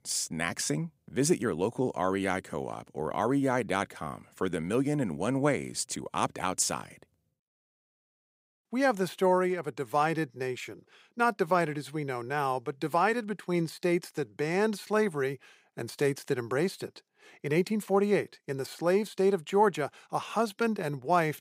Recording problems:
none

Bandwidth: 15.5 kHz